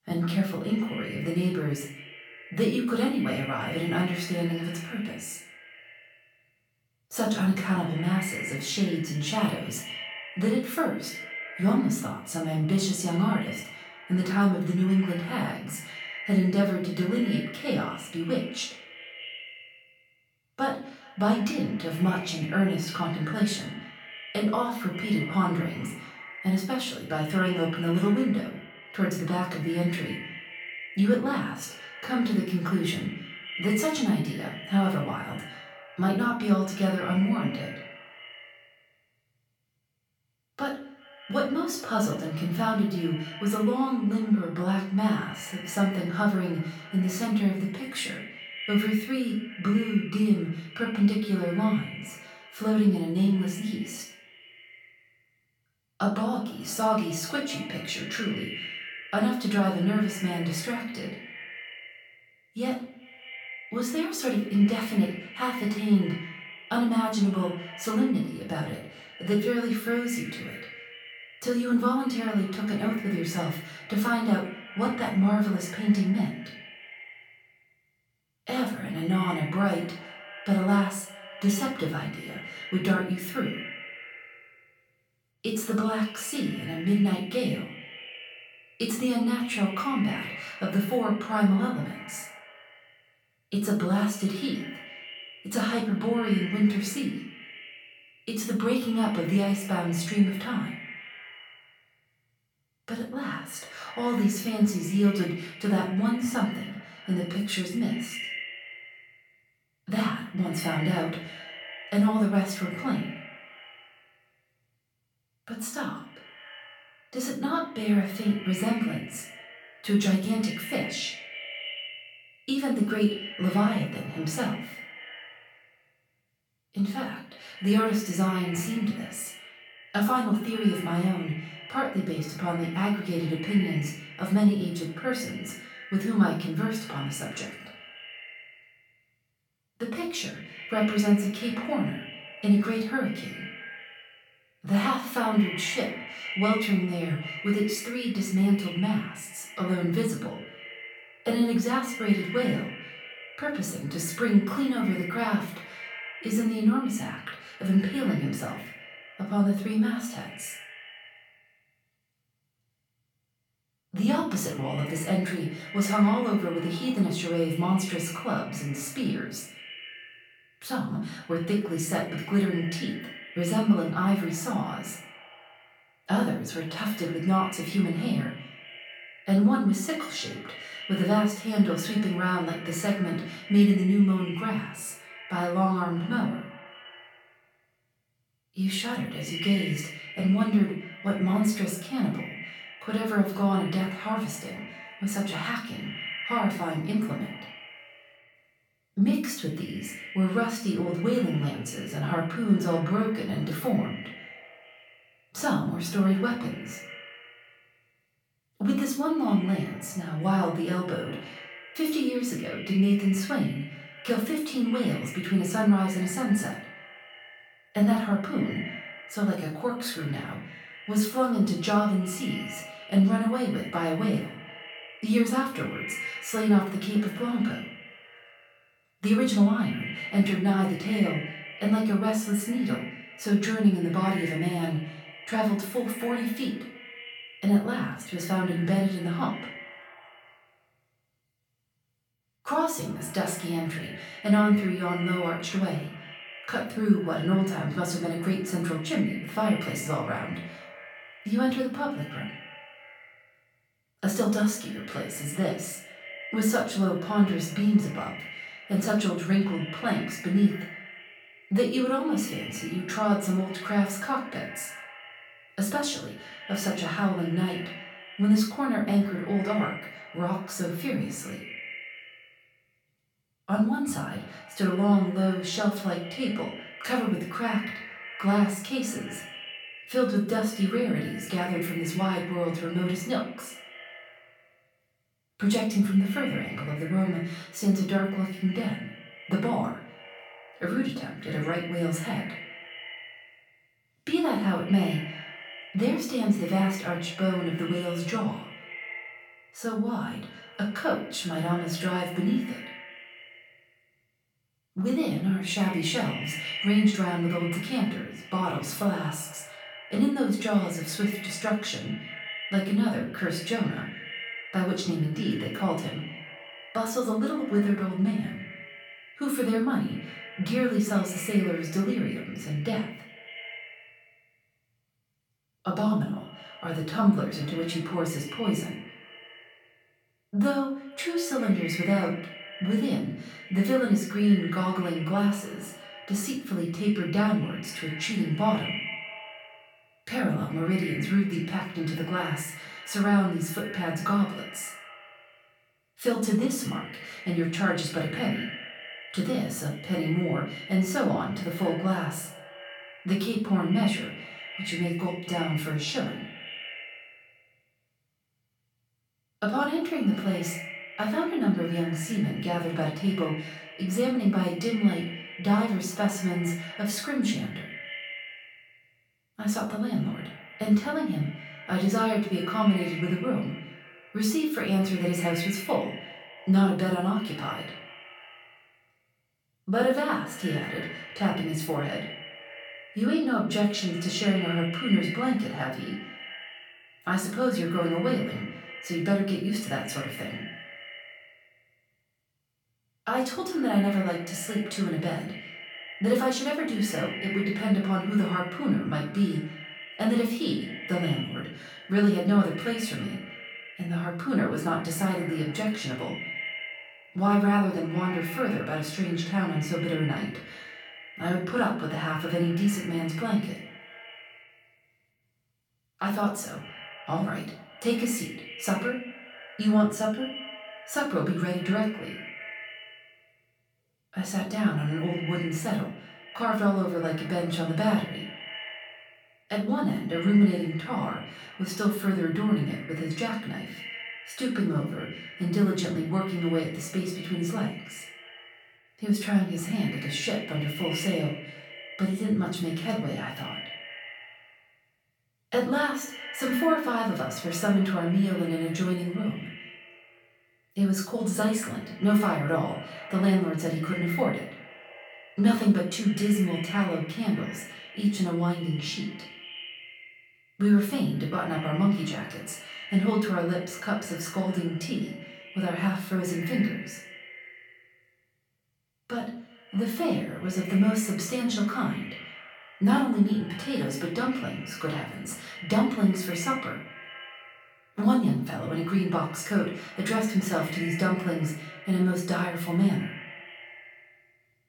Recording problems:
off-mic speech; far
echo of what is said; noticeable; throughout; 190 ms later, 15 dB below the speech
room echo; slight; dies away in 0.4 s

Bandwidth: 18 kHz